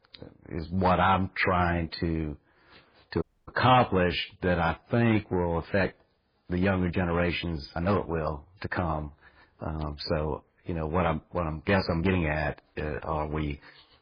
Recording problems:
garbled, watery; badly; nothing above 5 kHz
distortion; slight; 1.8% of the sound clipped
uneven, jittery; strongly; from 0.5 to 13 s
audio cutting out; at 3 s

